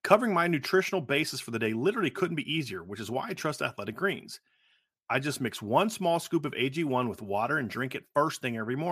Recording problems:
abrupt cut into speech; at the end

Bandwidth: 14.5 kHz